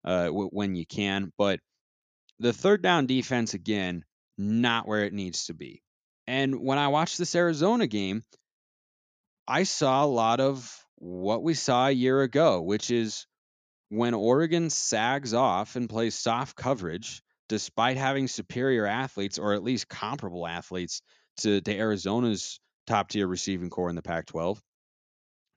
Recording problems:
none

